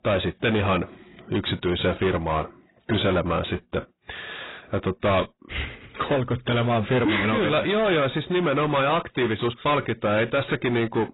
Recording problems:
distortion; heavy; 7 dB below the speech
garbled, watery; badly; nothing above 4 kHz

